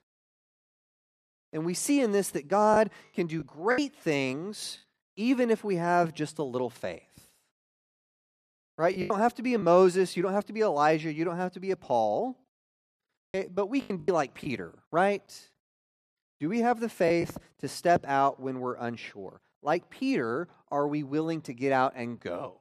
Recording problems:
choppy; very; from 2.5 to 4 s, at 9 s and from 14 to 17 s; 7% of the speech affected

